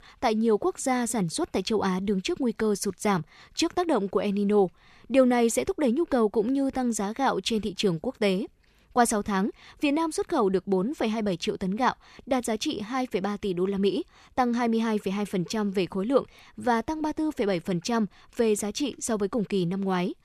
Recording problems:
none

